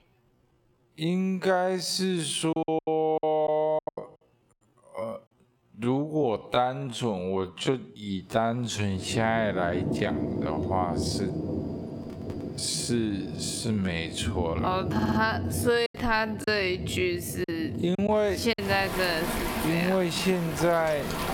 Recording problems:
squashed, flat; heavily, background pumping
wrong speed, natural pitch; too slow; 0.5 times normal speed
rain or running water; loud; from 8.5 s on; 6 dB below the speech
choppy; very; from 2.5 to 4 s and from 16 to 19 s; 14% of the speech affected
audio stuttering; at 15 s

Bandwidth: 17.5 kHz